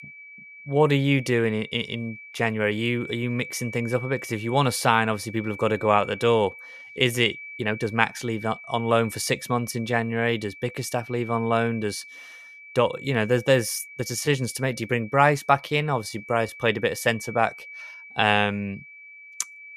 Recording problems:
high-pitched whine; noticeable; throughout; 2.5 kHz, 15 dB below the speech
uneven, jittery; strongly; from 0.5 to 19 s

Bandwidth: 14.5 kHz